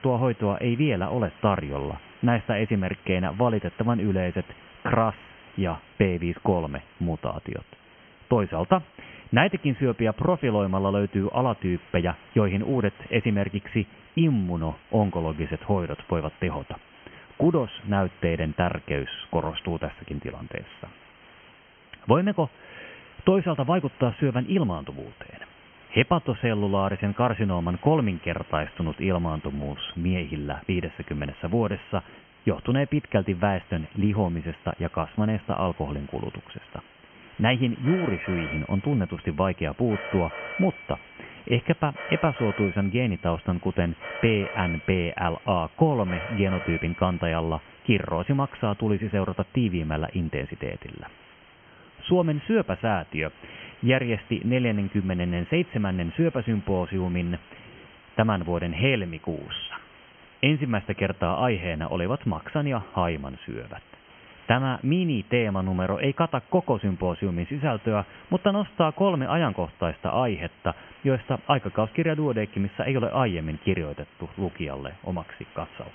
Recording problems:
high frequencies cut off; severe; nothing above 3 kHz
hiss; faint; throughout; 25 dB below the speech
phone ringing; noticeable; from 38 to 47 s; peak 7 dB below the speech

